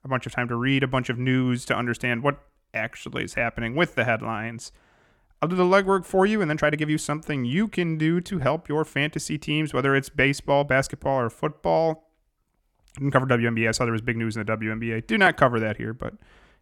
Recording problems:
uneven, jittery; strongly; from 2.5 to 14 s

